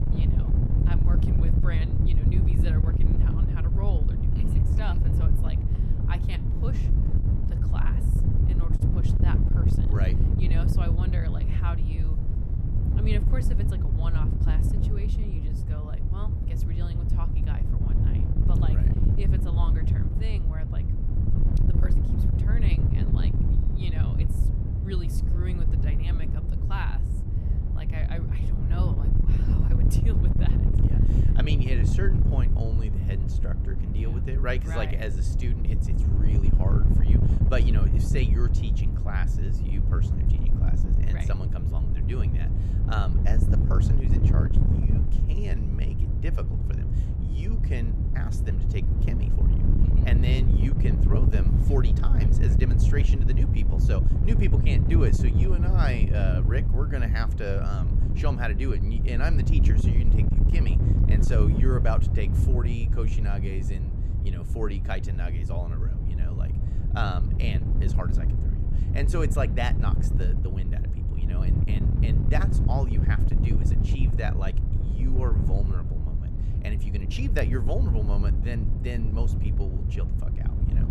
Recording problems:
wind noise on the microphone; heavy; 1 dB below the speech
door banging; faint; from 5 to 8 s; peak 15 dB below the speech

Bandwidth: 15 kHz